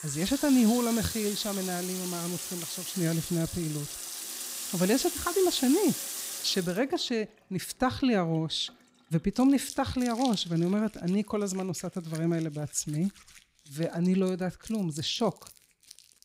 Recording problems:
household noises; loud; throughout; 6 dB below the speech

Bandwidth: 15.5 kHz